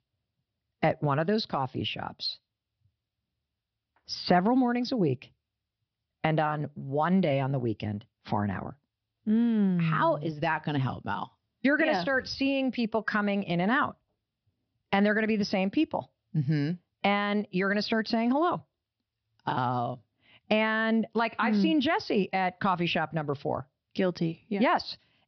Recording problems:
high frequencies cut off; noticeable; nothing above 5.5 kHz

